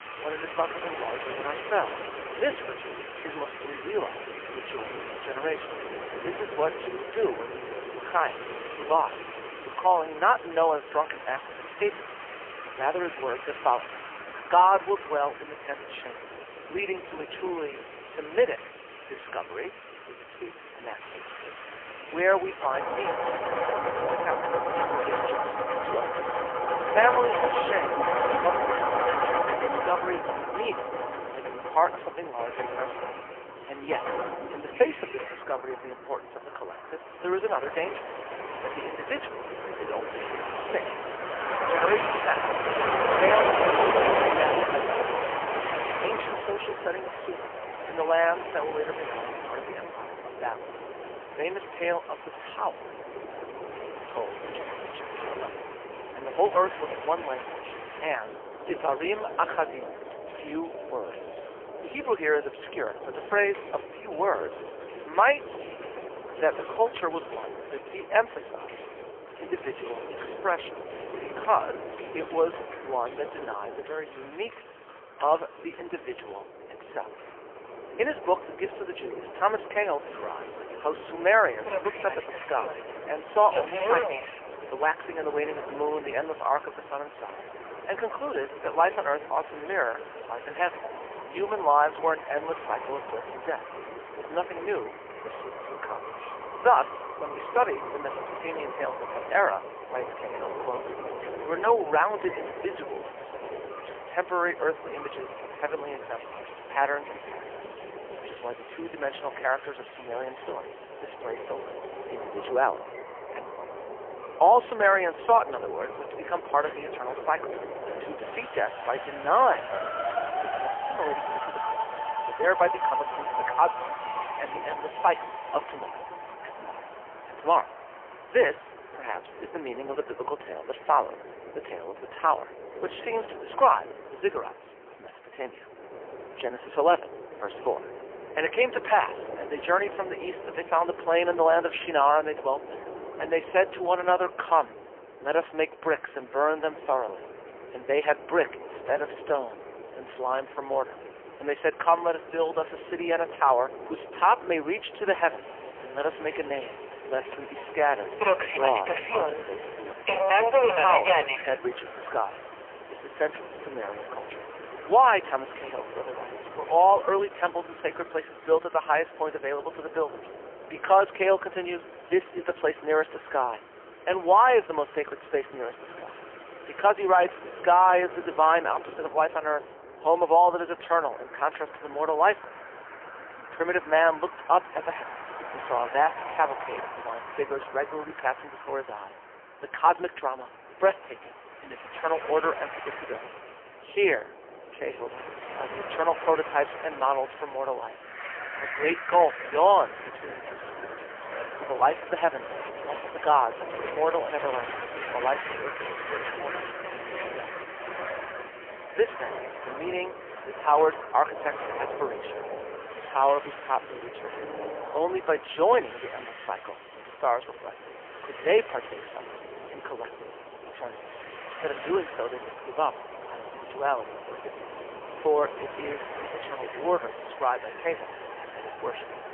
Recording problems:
phone-call audio; poor line; nothing above 3 kHz
rain or running water; loud; throughout; 9 dB below the speech
train or aircraft noise; loud; throughout; 8 dB below the speech
traffic noise; noticeable; throughout; 15 dB below the speech

